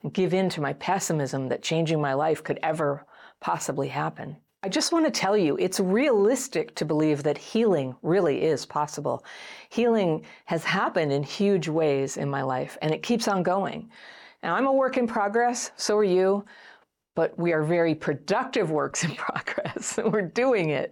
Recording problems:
none

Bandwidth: 18 kHz